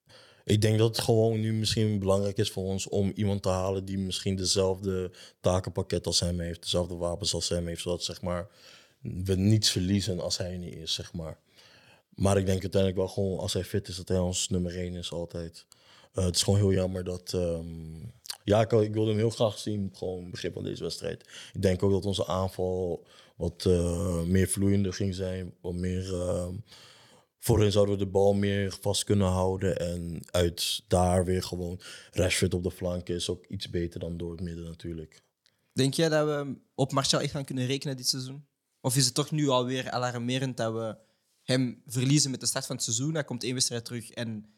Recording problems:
none

